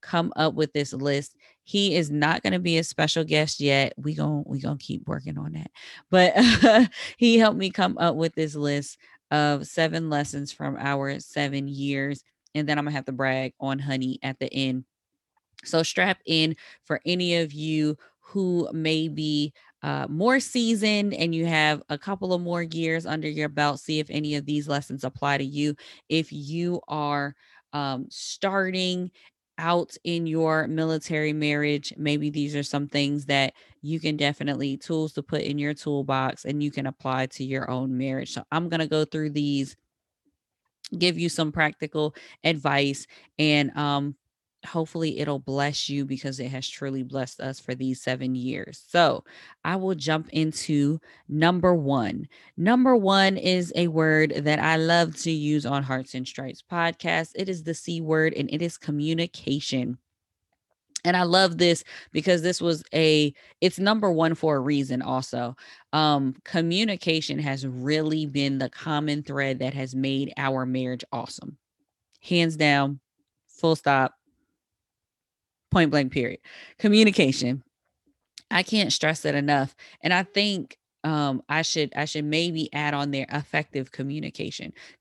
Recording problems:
none

